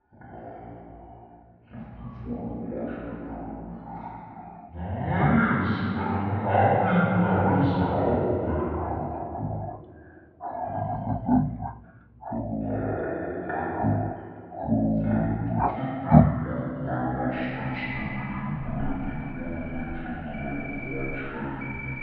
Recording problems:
room echo; strong; dies away in 2.6 s
off-mic speech; far
muffled; very; fading above 3 kHz
wrong speed and pitch; too slow and too low; 0.5 times normal speed
animal sounds; loud; throughout; 1 dB below the speech

